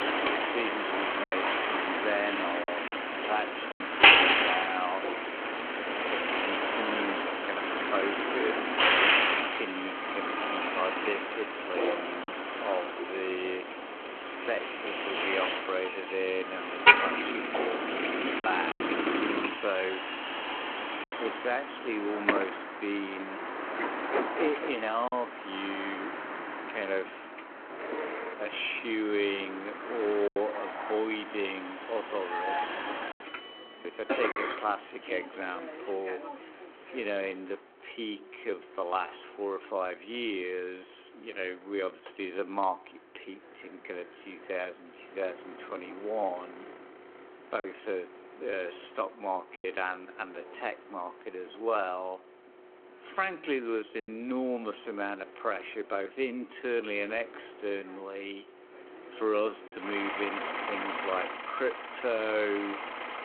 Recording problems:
wrong speed, natural pitch; too slow; 0.6 times normal speed
phone-call audio
traffic noise; very loud; throughout; 5 dB above the speech
choppy; occasionally; 2% of the speech affected

